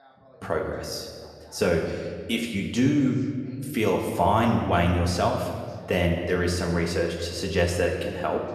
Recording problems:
room echo; noticeable; dies away in 1.6 s
off-mic speech; somewhat distant
voice in the background; faint; throughout; 30 dB below the speech

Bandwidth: 13.5 kHz